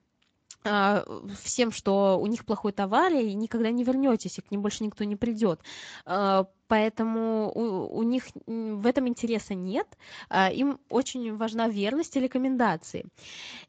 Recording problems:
garbled, watery; slightly; nothing above 7.5 kHz

